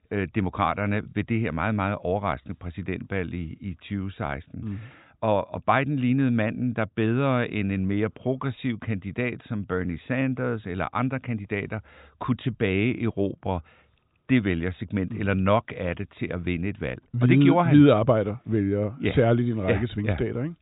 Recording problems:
high frequencies cut off; severe; nothing above 4 kHz

